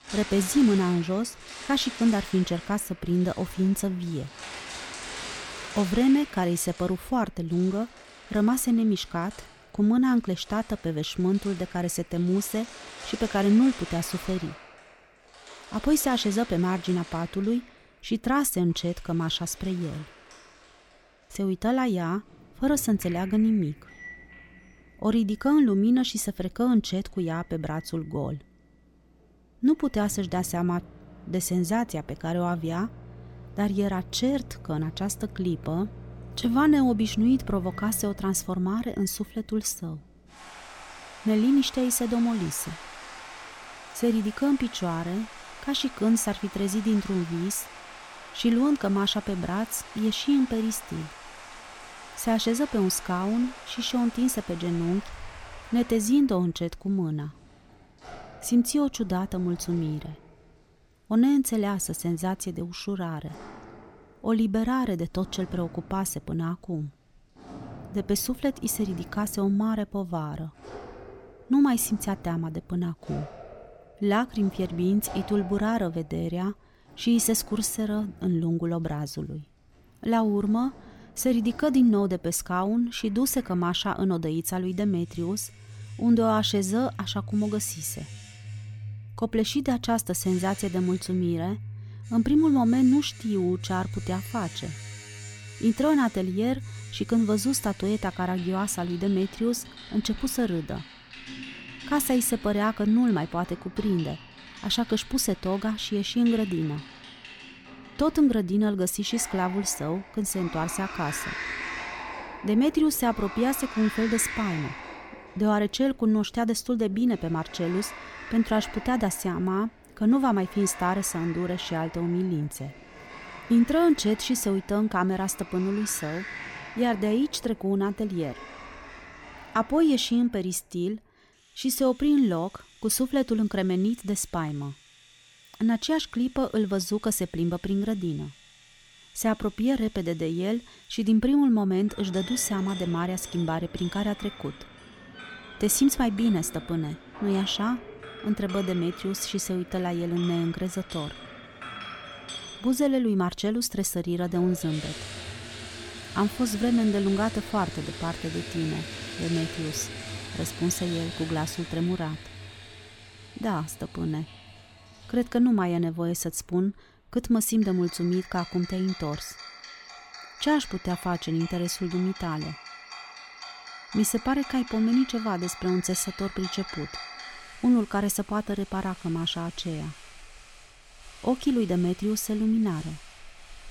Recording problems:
household noises; noticeable; throughout; 15 dB below the speech

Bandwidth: 18 kHz